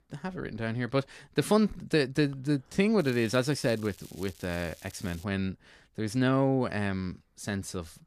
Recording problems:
crackling; faint; from 3 to 5 s; 20 dB below the speech

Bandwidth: 14.5 kHz